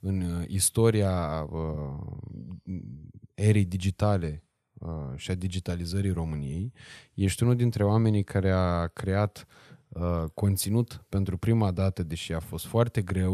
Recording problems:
abrupt cut into speech; at the end

